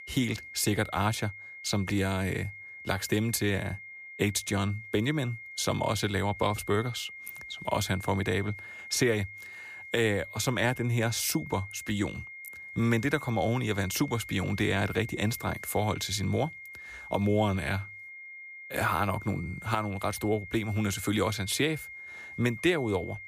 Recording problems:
high-pitched whine; noticeable; throughout; 2 kHz, 10 dB below the speech

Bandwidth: 15 kHz